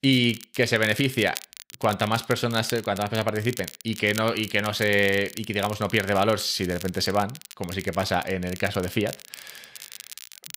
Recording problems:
crackle, like an old record; noticeable; 15 dB below the speech

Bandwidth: 15.5 kHz